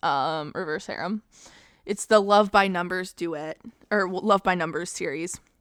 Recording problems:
none

